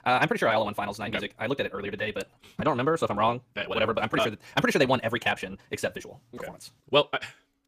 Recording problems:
wrong speed, natural pitch; too fast; 1.7 times normal speed

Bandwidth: 15 kHz